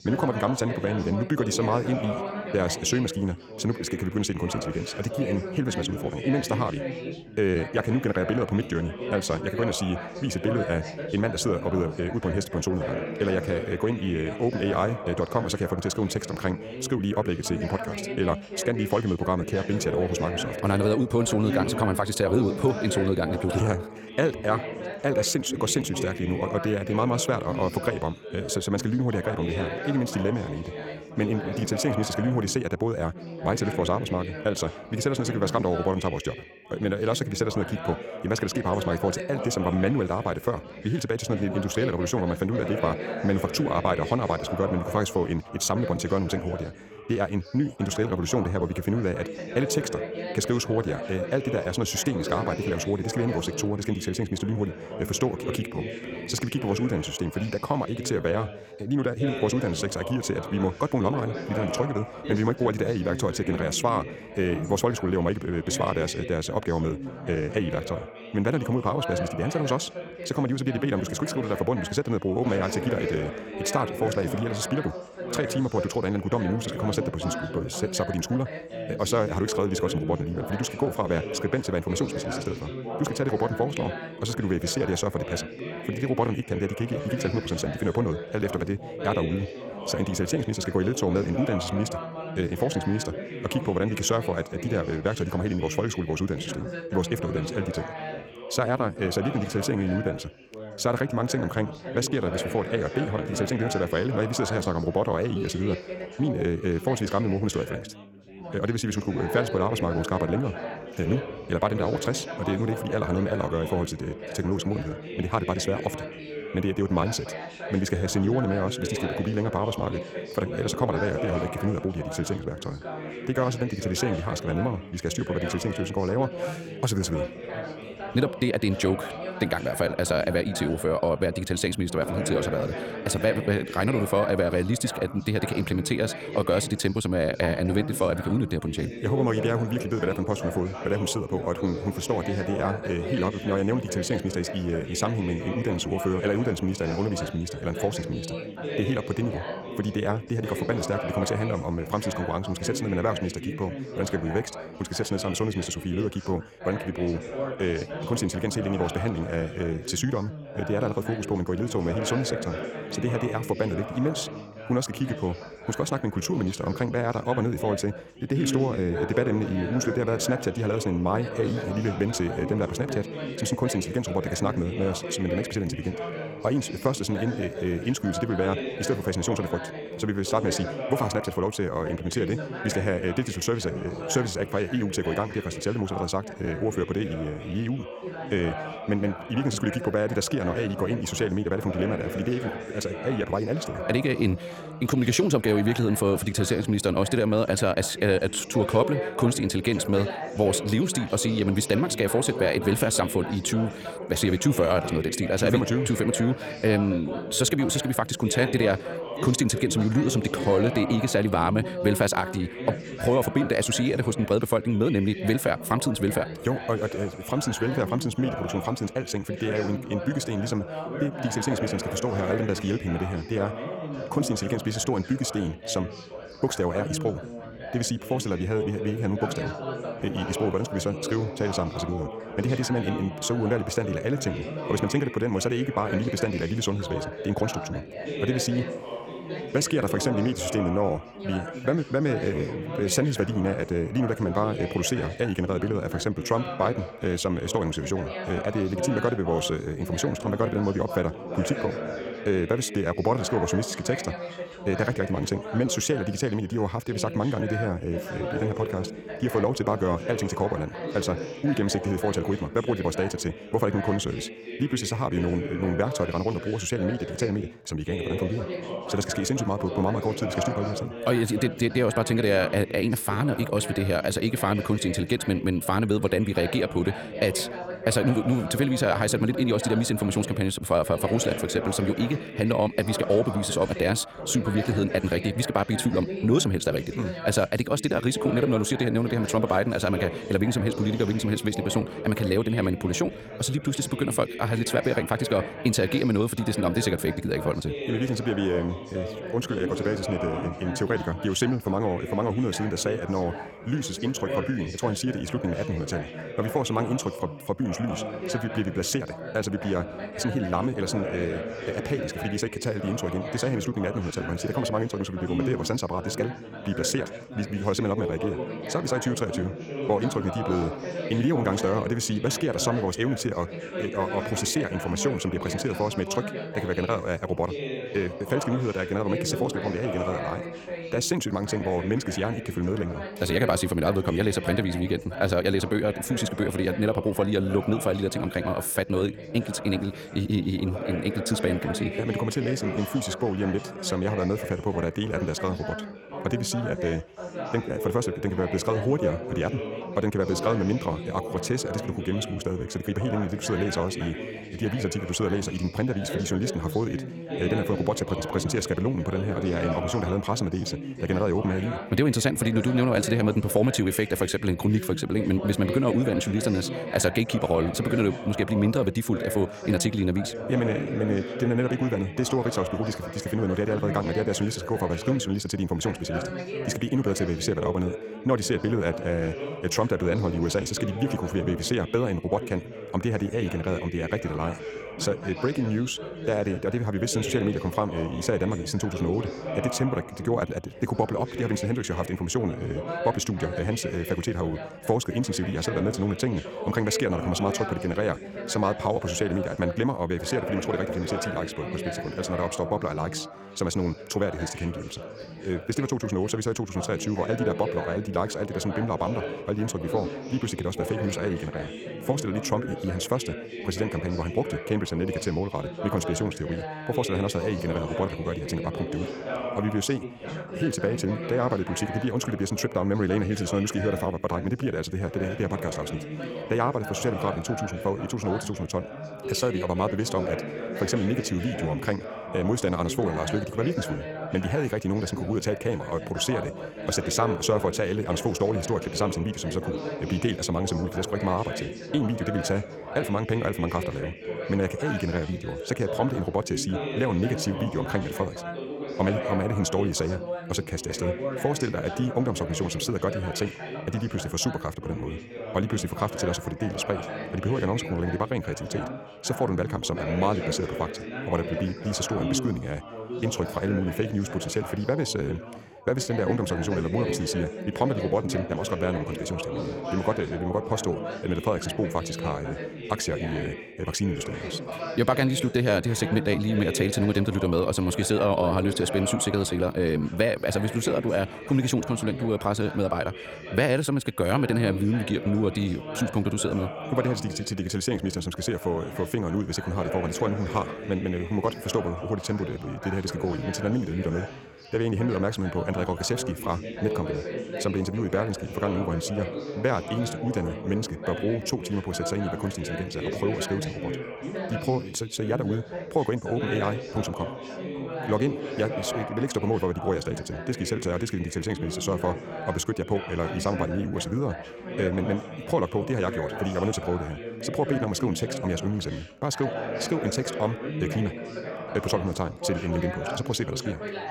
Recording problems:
wrong speed, natural pitch; too fast; 1.6 times normal speed
background chatter; loud; throughout; 4 voices, 8 dB below the speech

